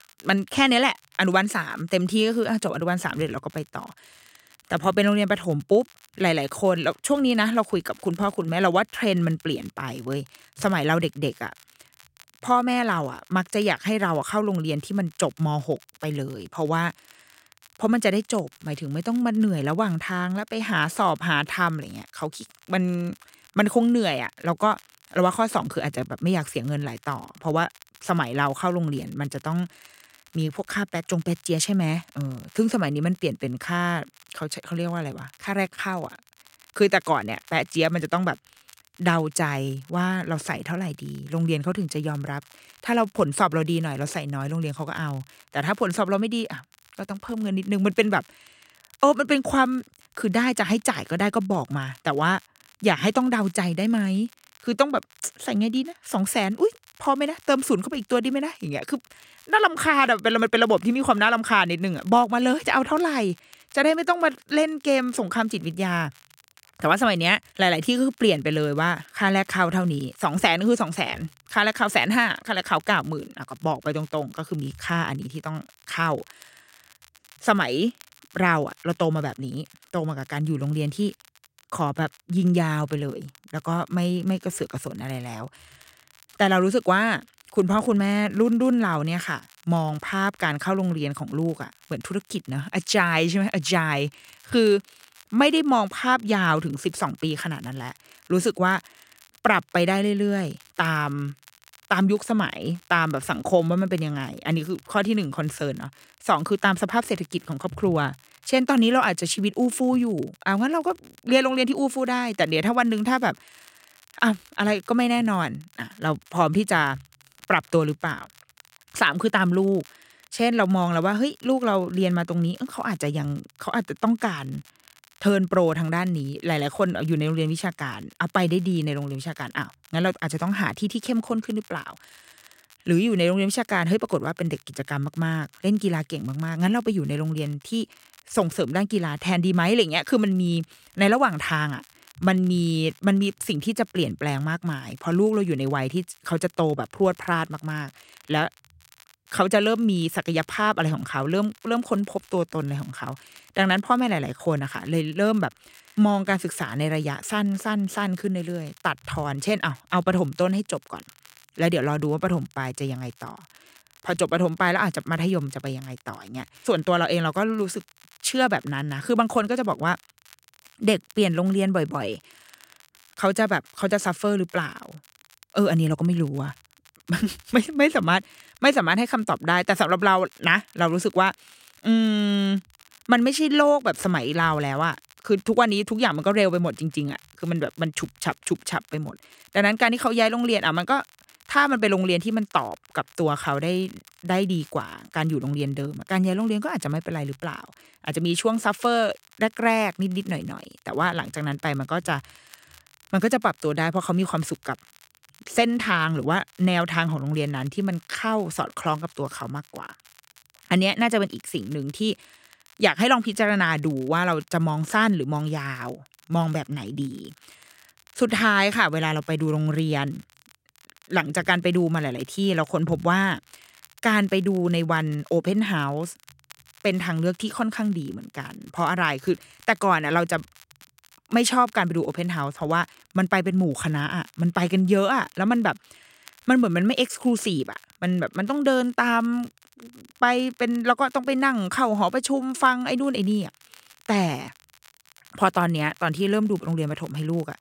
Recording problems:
crackle, like an old record; faint; 30 dB below the speech

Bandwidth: 16 kHz